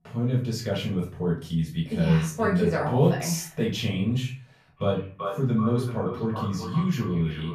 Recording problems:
echo of what is said; strong; from 5 s on; 390 ms later, 10 dB below the speech
off-mic speech; far
room echo; slight; dies away in 0.3 s

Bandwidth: 14.5 kHz